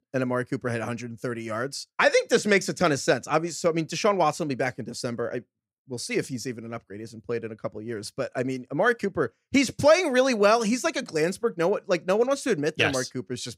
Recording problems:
none

